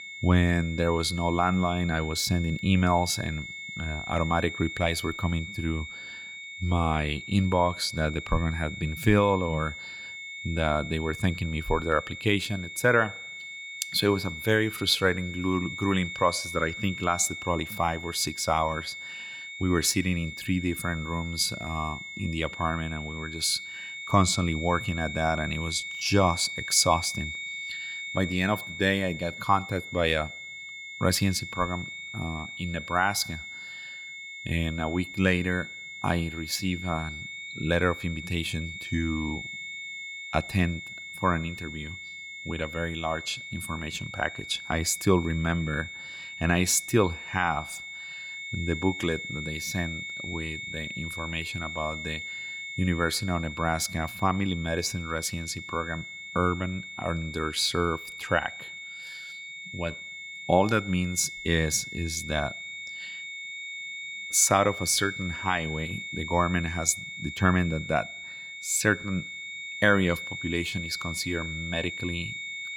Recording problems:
high-pitched whine; loud; throughout; 2 kHz, 9 dB below the speech

